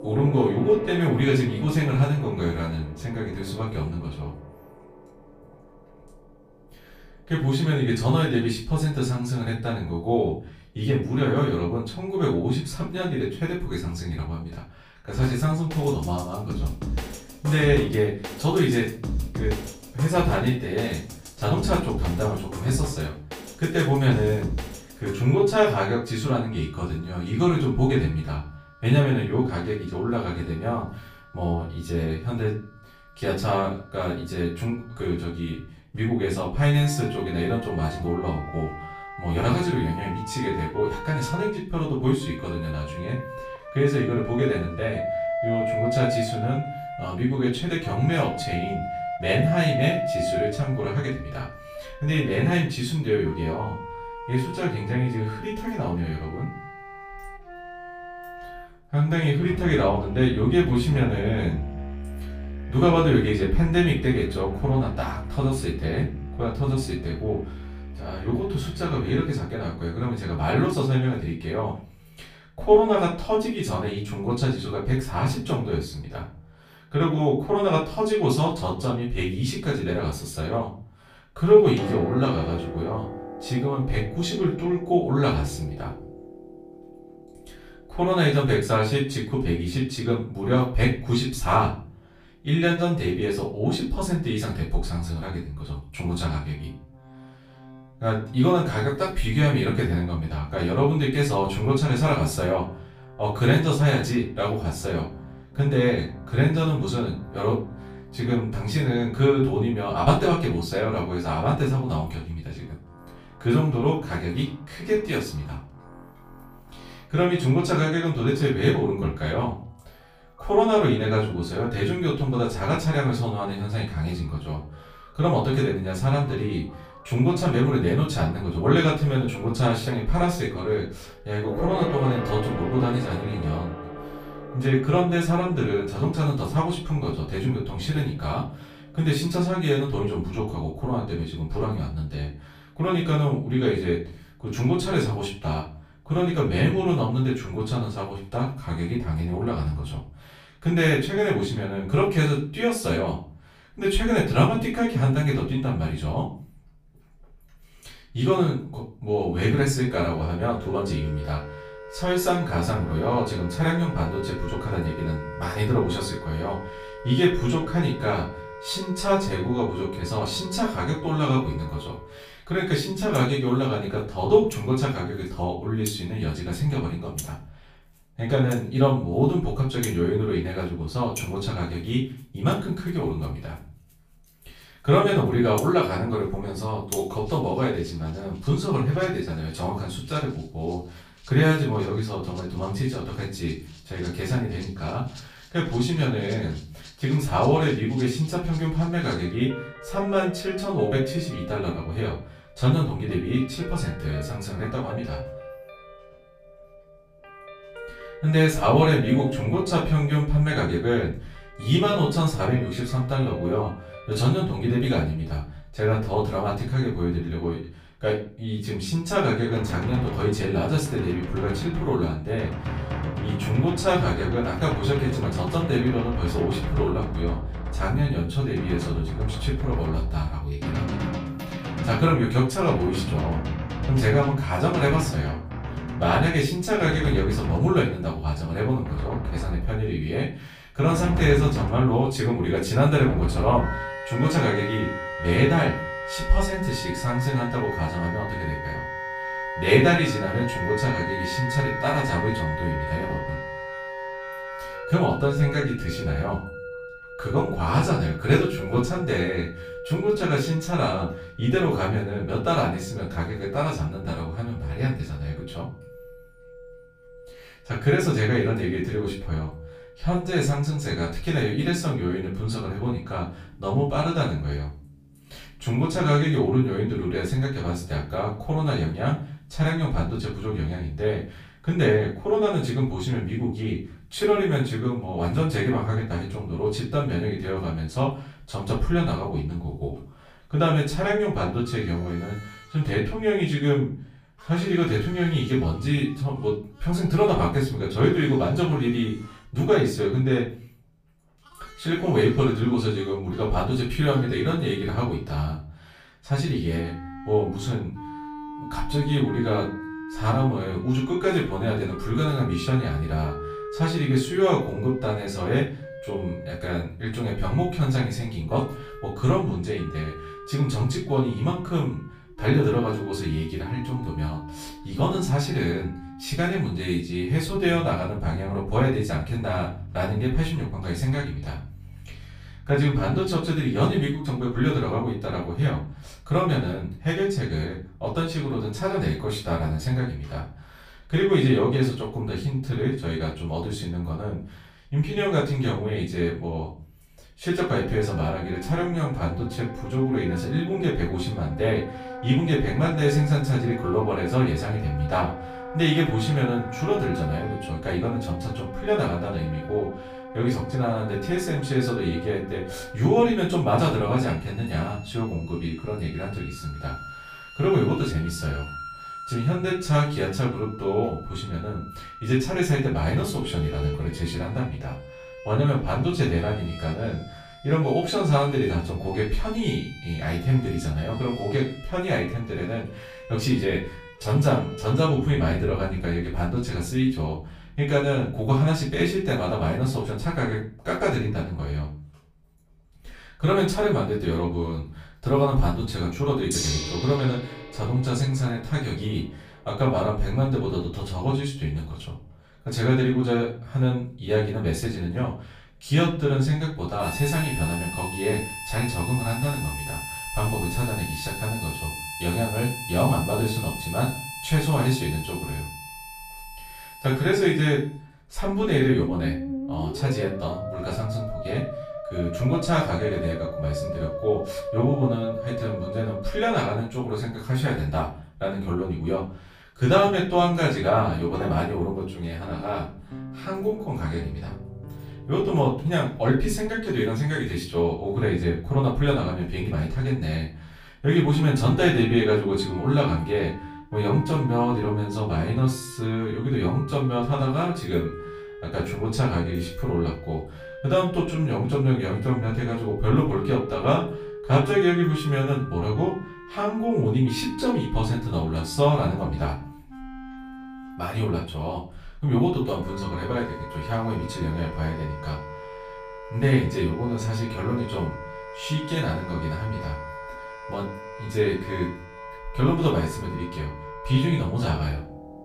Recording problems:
off-mic speech; far
room echo; slight; dies away in 0.4 s
background music; noticeable; throughout; 10 dB below the speech

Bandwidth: 15 kHz